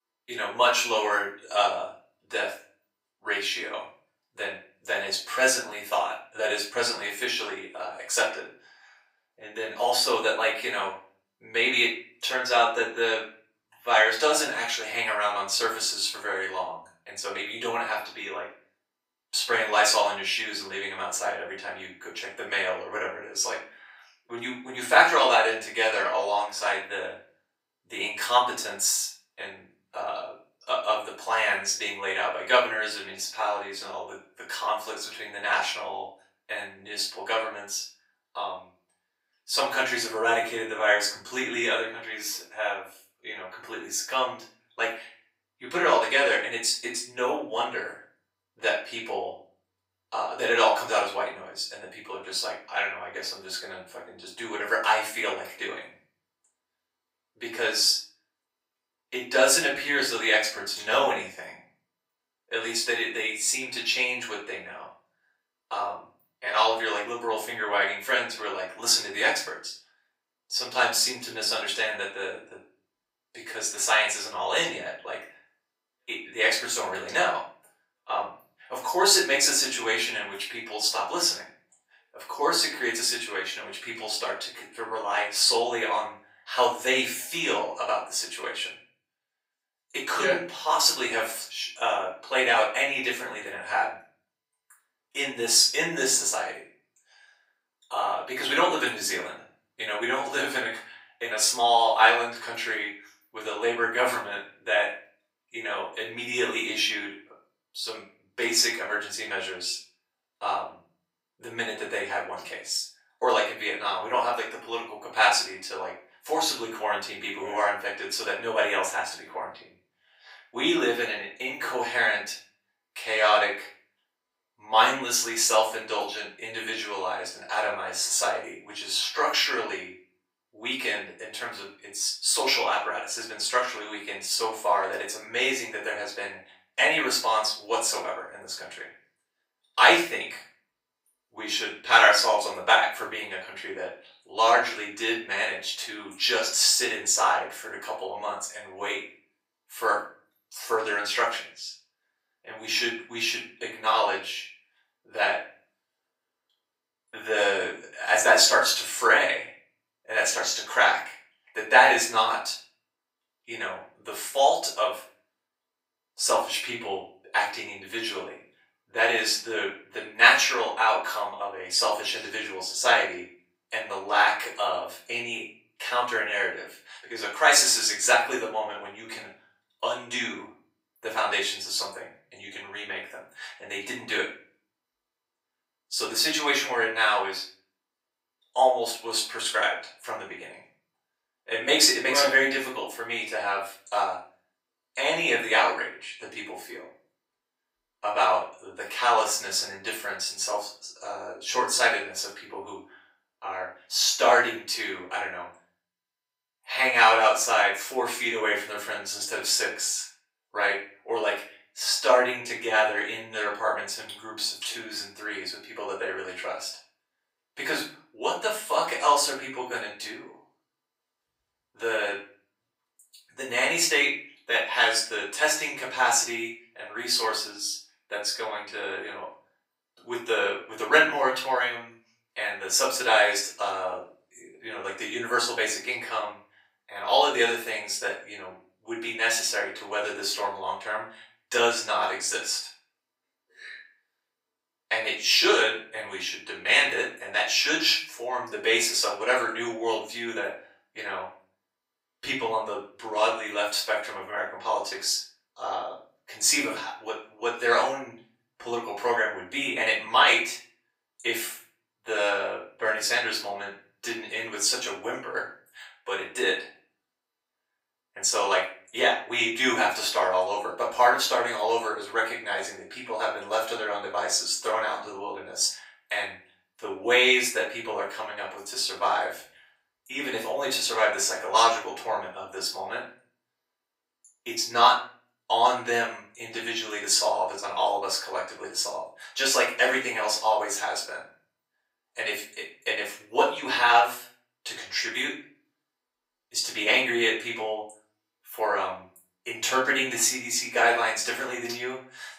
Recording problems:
off-mic speech; far
thin; very; fading below 700 Hz
room echo; slight; dies away in 0.4 s

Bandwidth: 15.5 kHz